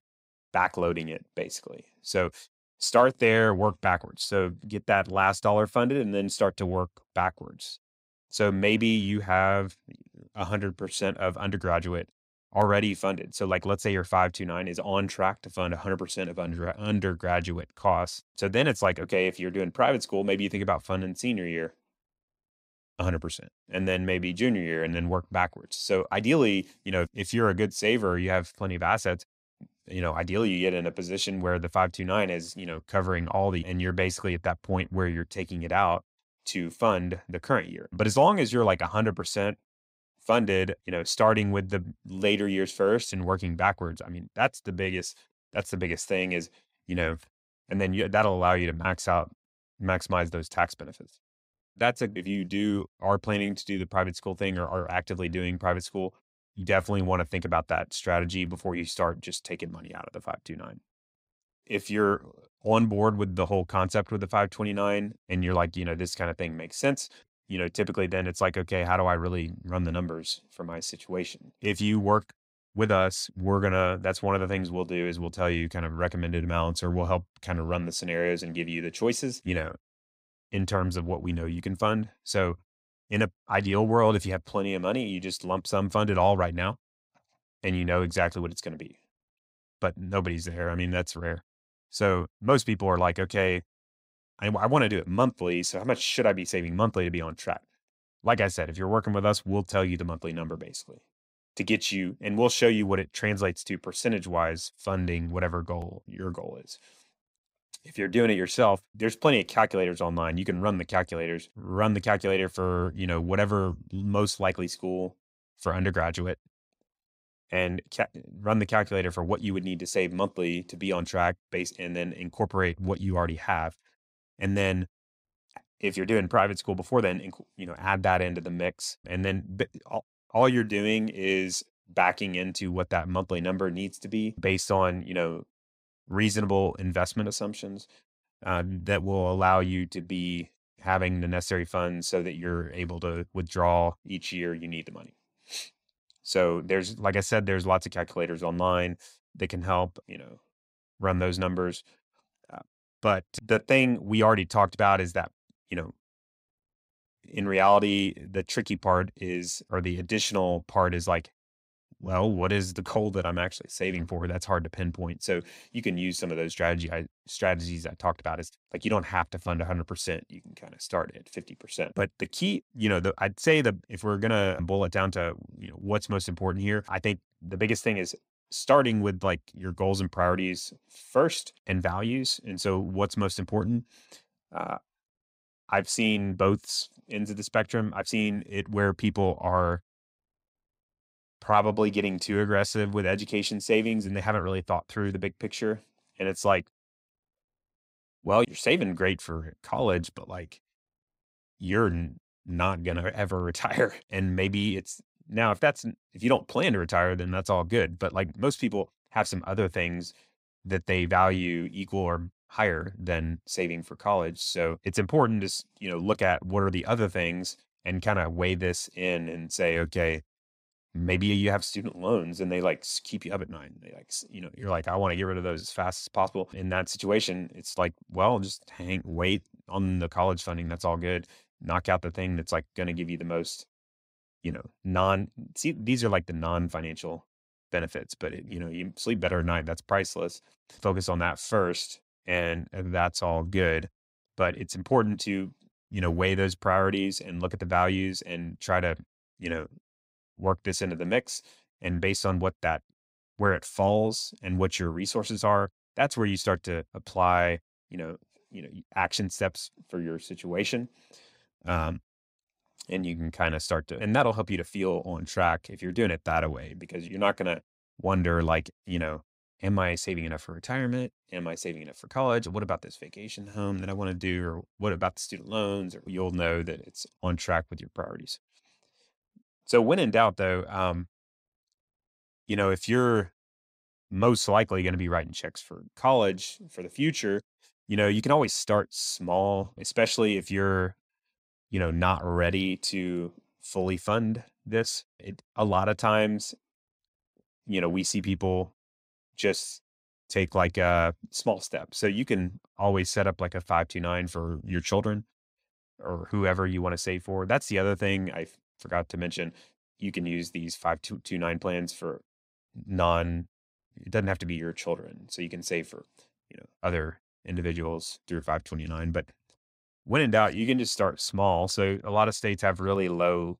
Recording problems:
none

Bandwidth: 15.5 kHz